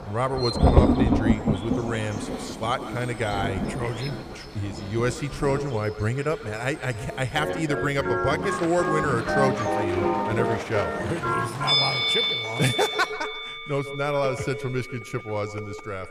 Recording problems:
echo of what is said; noticeable; throughout; 140 ms later, 15 dB below the speech
background music; very loud; from 7.5 s on; 1 dB above the speech
rain or running water; loud; until 12 s; 1 dB below the speech
animal sounds; noticeable; throughout; 10 dB below the speech

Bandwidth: 14.5 kHz